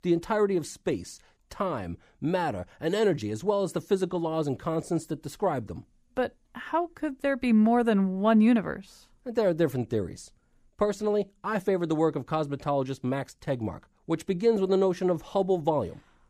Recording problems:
none

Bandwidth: 15 kHz